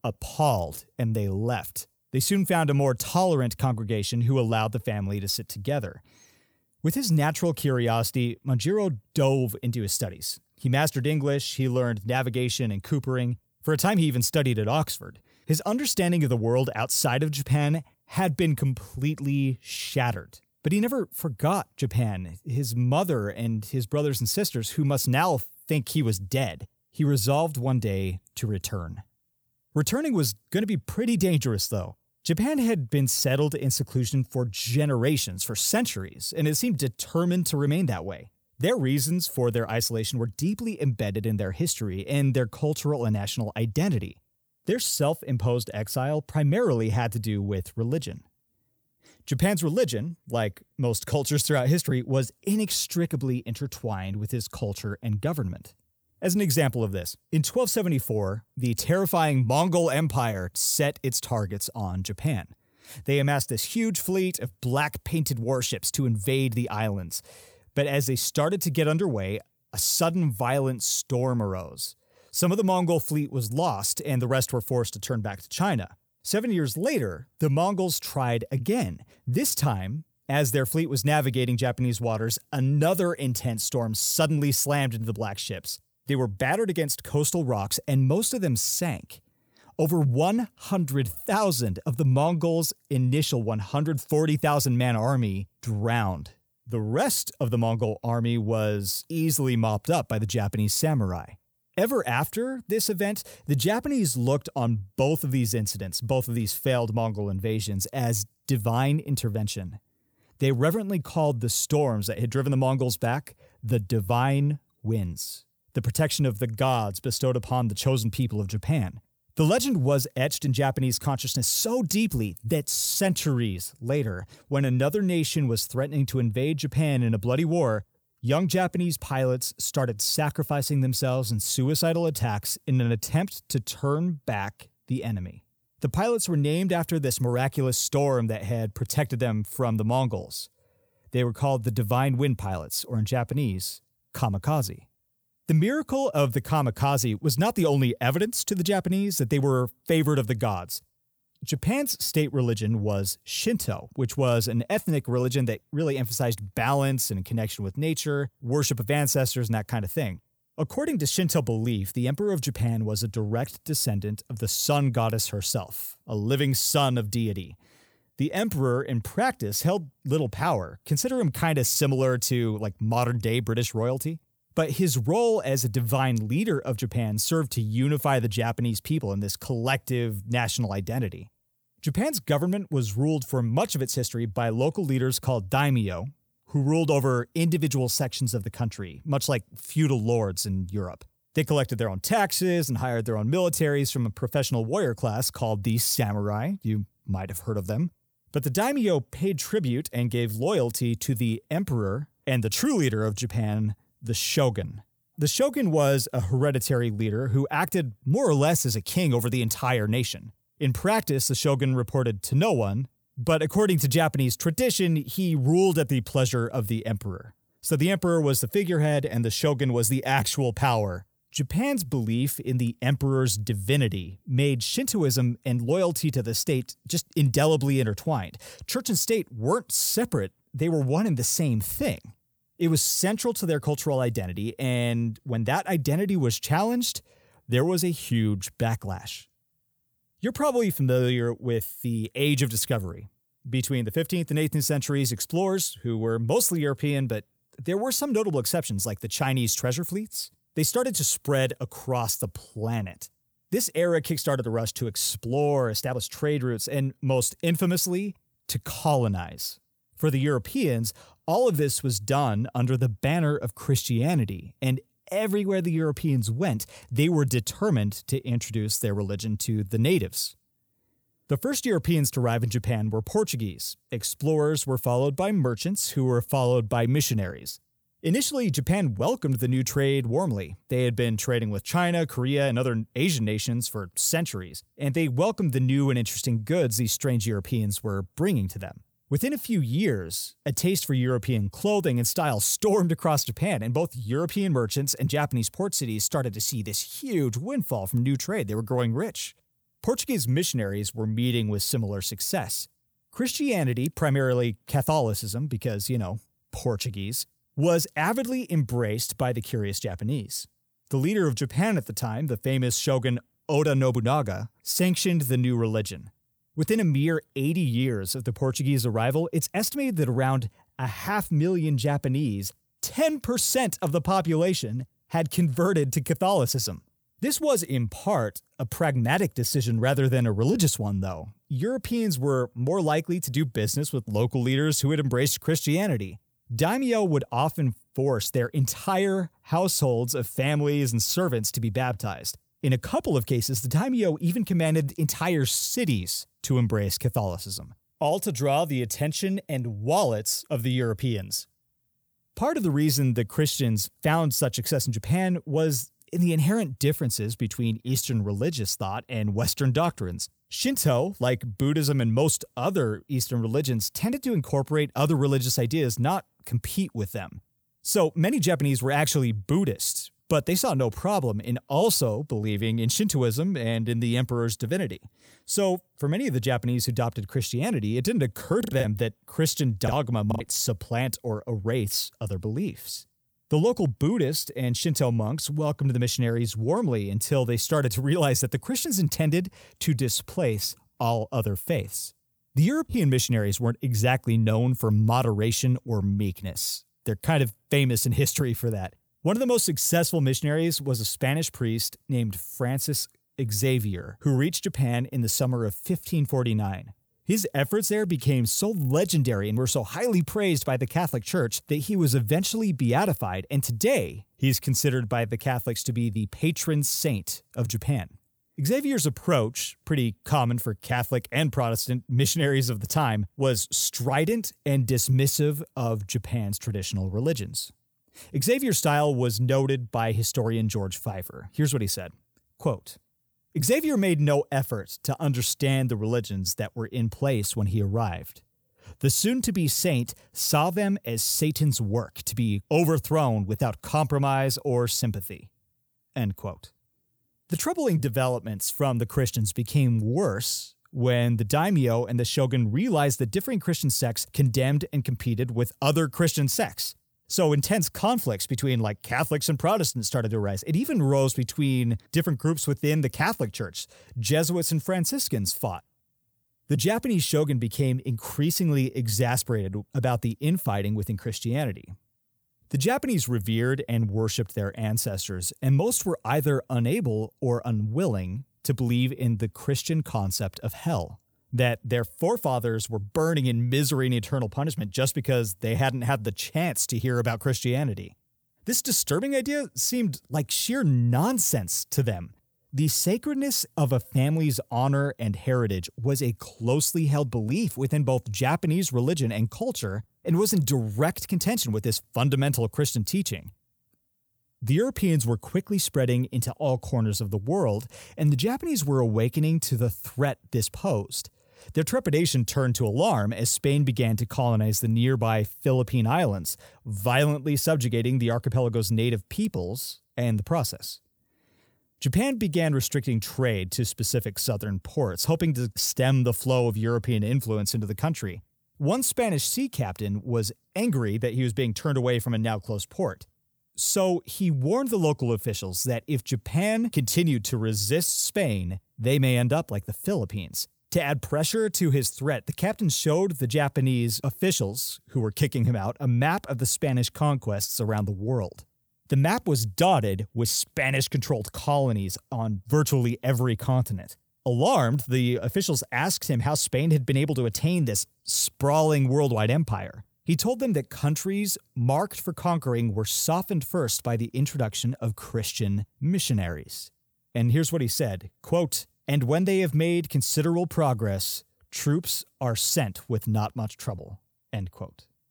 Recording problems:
choppy; very; from 6:19 to 6:20; 11% of the speech affected

